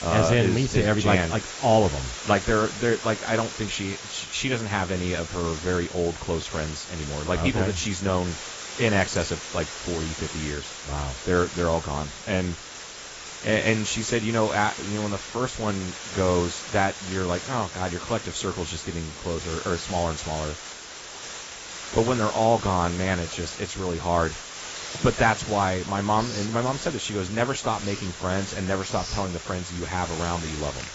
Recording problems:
garbled, watery; badly; nothing above 8 kHz
hiss; loud; throughout; 9 dB below the speech
household noises; noticeable; throughout; 15 dB below the speech

